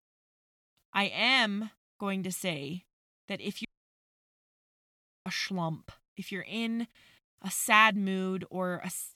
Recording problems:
audio cutting out; at 3.5 s for 1.5 s

